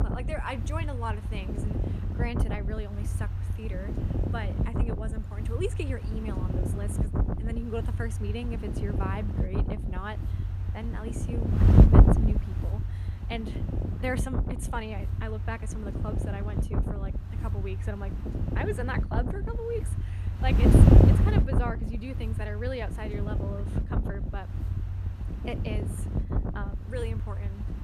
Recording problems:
wind noise on the microphone; heavy; 1 dB above the speech

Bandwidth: 14.5 kHz